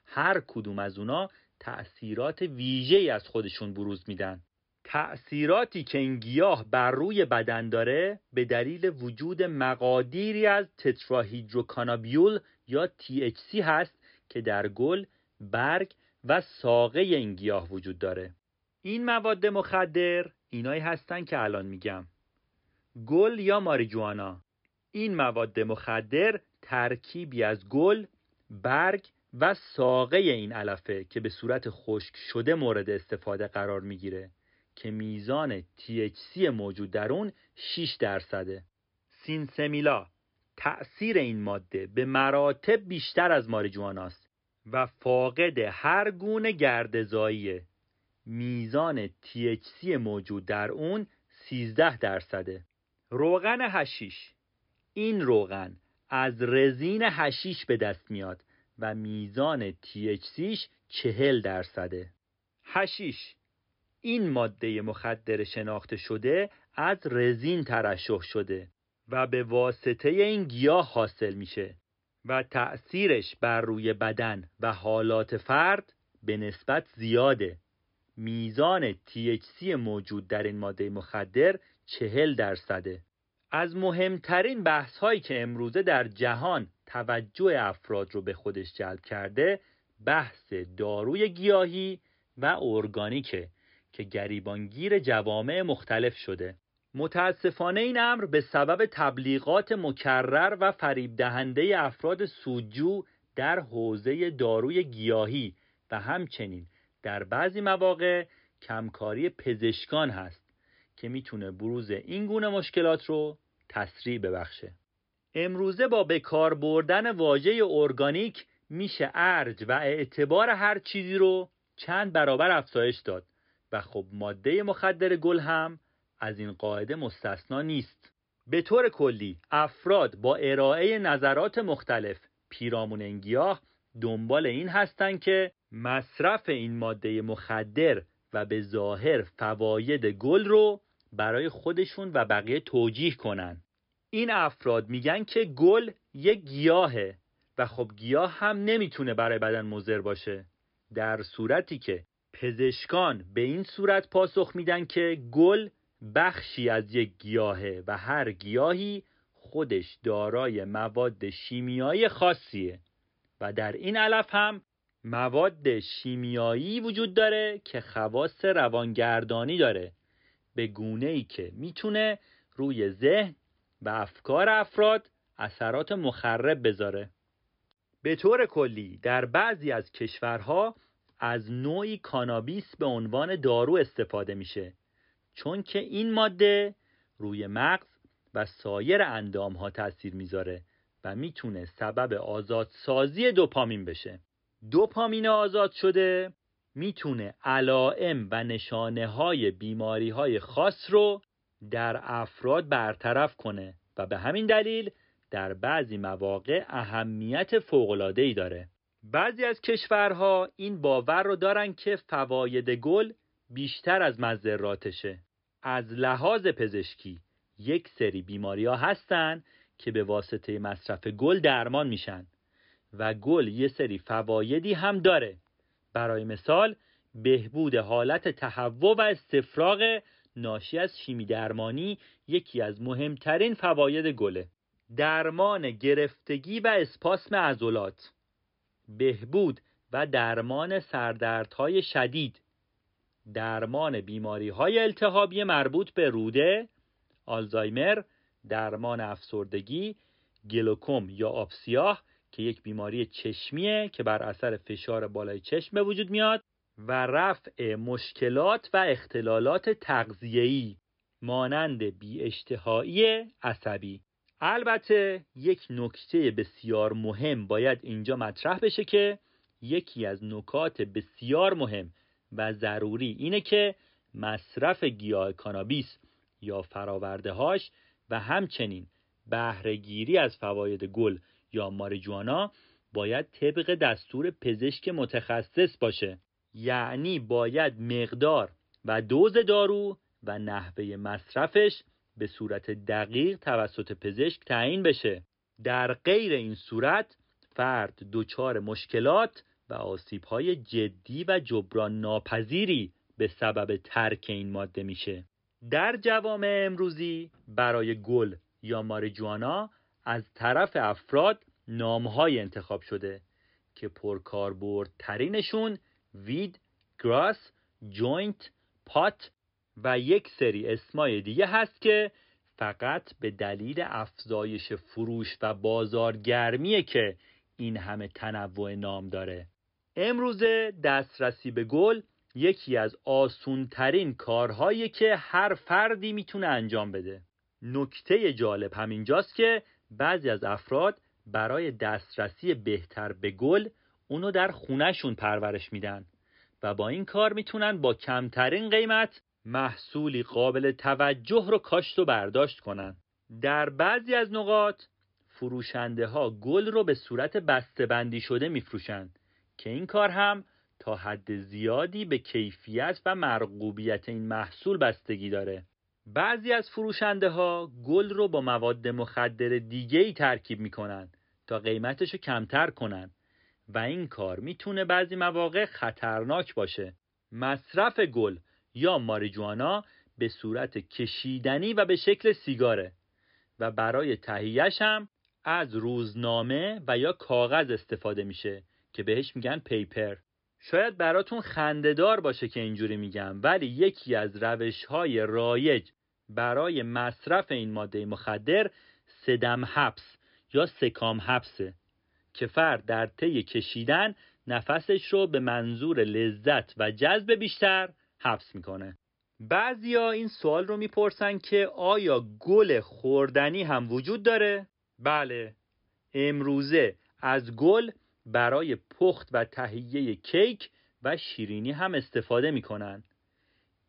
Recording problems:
high frequencies cut off; noticeable; nothing above 5.5 kHz

